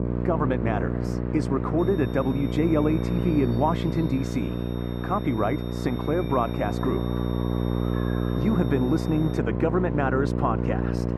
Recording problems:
muffled; very; fading above 2.5 kHz
electrical hum; loud; throughout; 60 Hz, 6 dB below the speech
animal sounds; noticeable; until 4.5 s; 15 dB below the speech
crowd noise; noticeable; throughout; 20 dB below the speech
high-pitched whine; faint; from 2 to 9.5 s; 3.5 kHz, 20 dB below the speech

